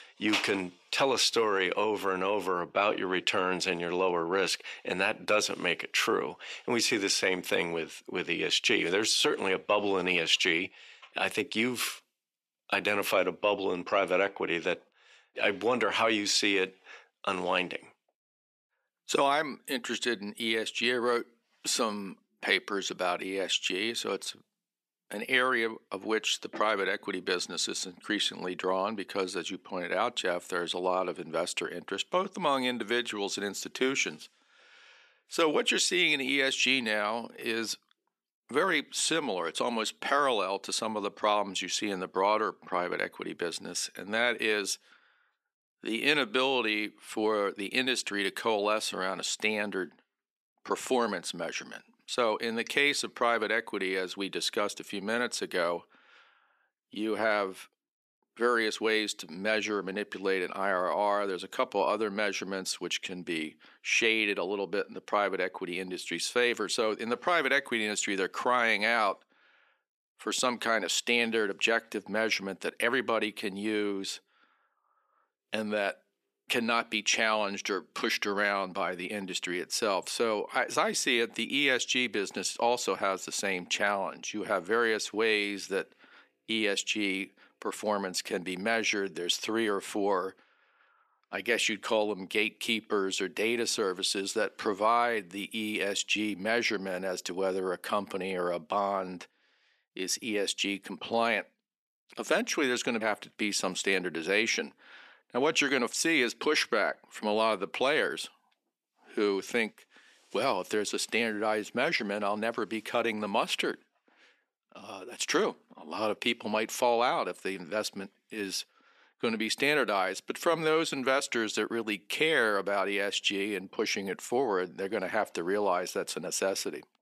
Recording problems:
thin; somewhat; fading below 350 Hz

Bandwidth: 14 kHz